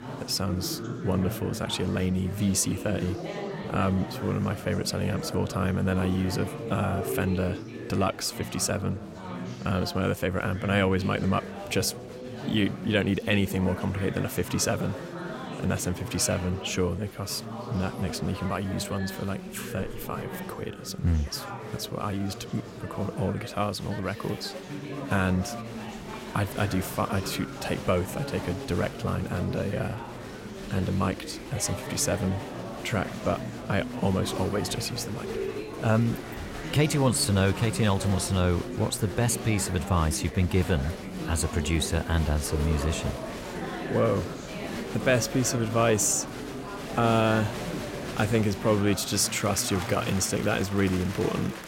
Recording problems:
chatter from many people; loud; throughout; 8 dB below the speech

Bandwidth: 16 kHz